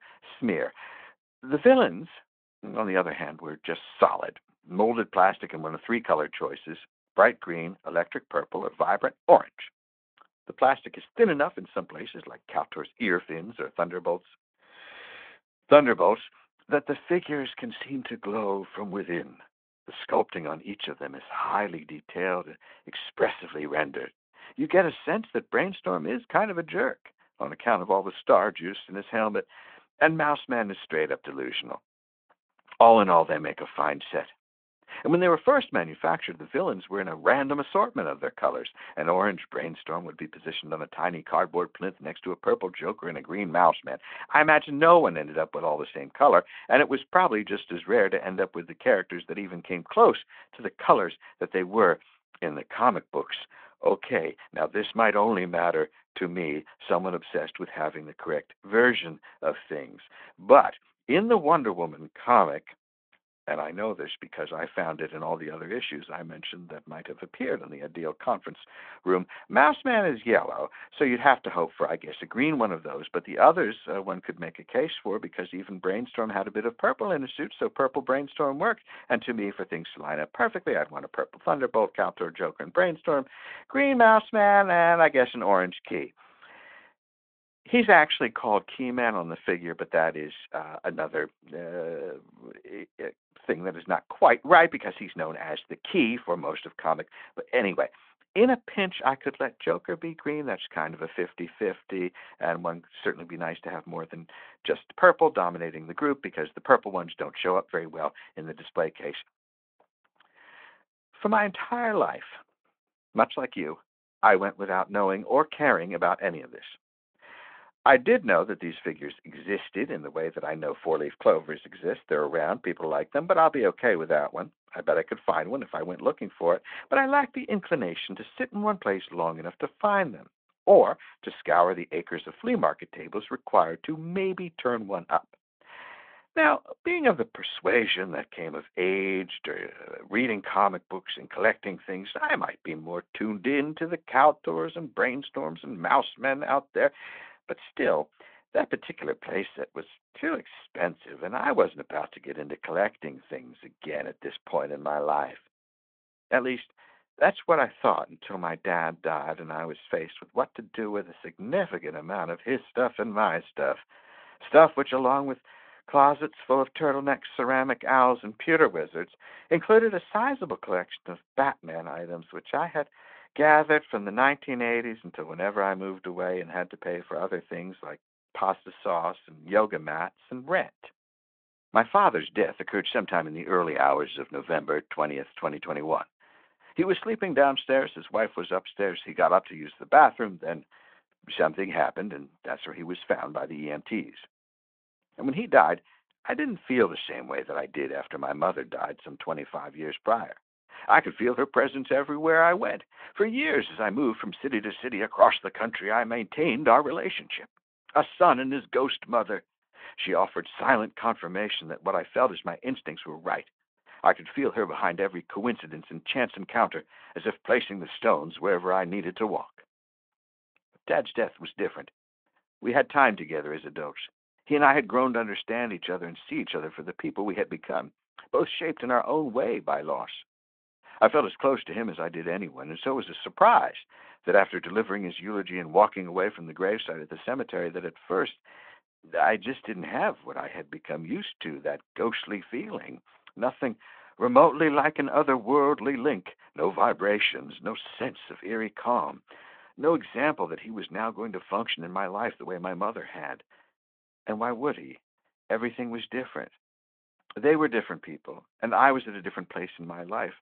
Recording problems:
phone-call audio

